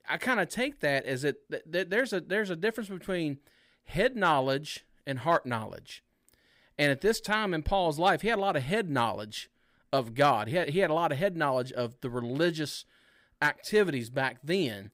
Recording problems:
none

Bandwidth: 15.5 kHz